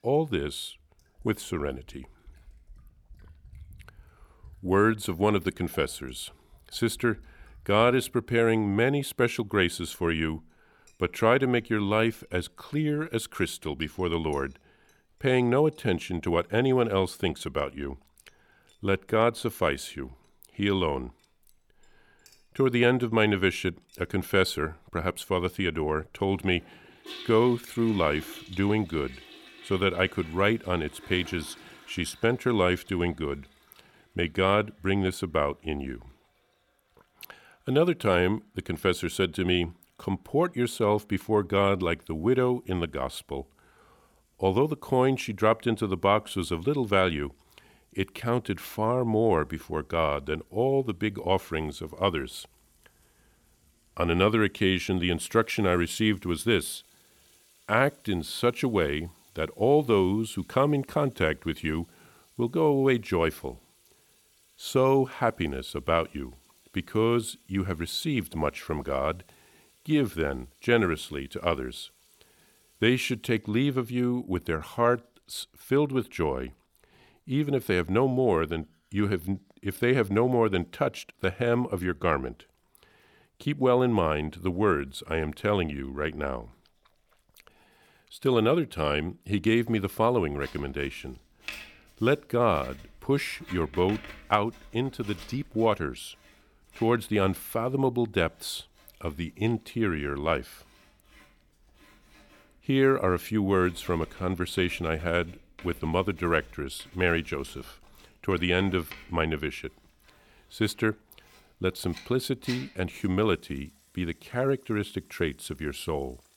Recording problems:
household noises; faint; throughout; 25 dB below the speech

